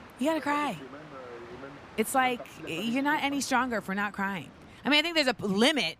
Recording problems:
train or aircraft noise; noticeable; throughout; 20 dB below the speech

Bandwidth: 15 kHz